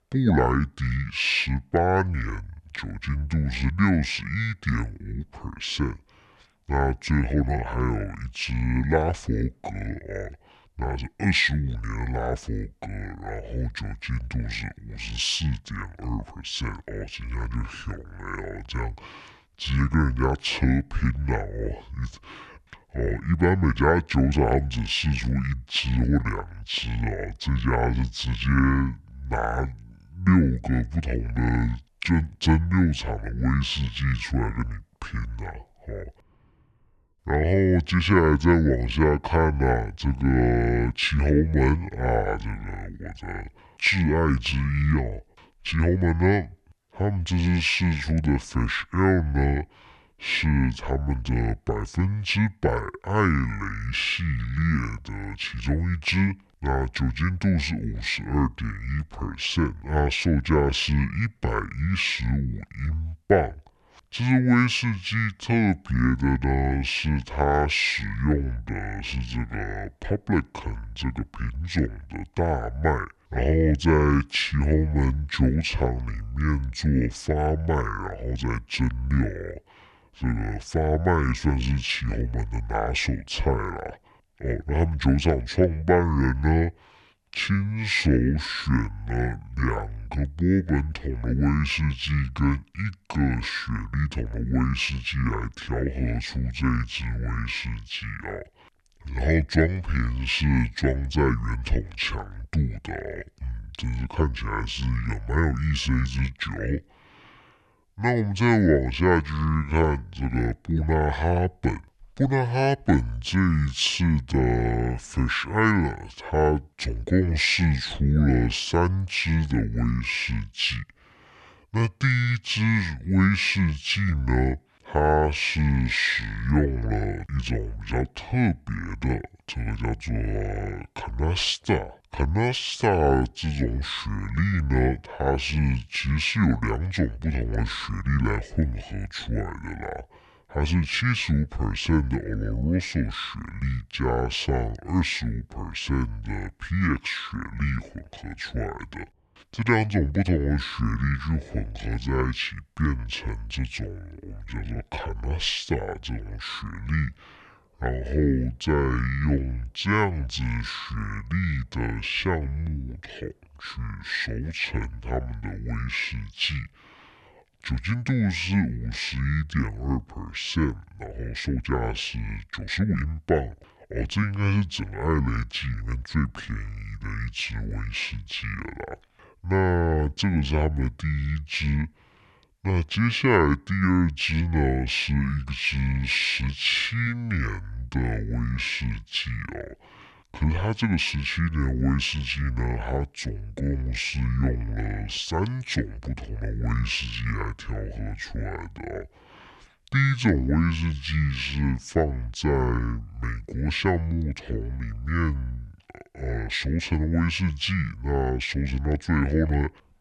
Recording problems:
wrong speed and pitch; too slow and too low; 0.6 times normal speed
uneven, jittery; strongly; from 7.5 s to 2:53

